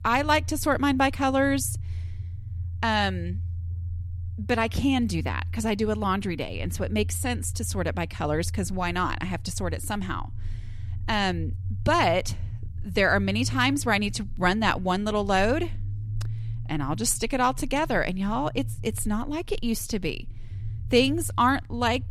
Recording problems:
low rumble; faint; throughout; 25 dB below the speech

